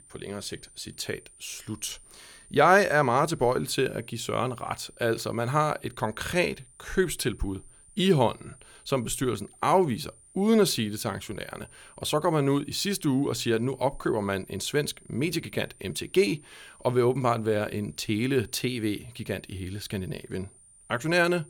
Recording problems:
high-pitched whine; faint; throughout; 9 kHz, 25 dB below the speech

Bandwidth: 17.5 kHz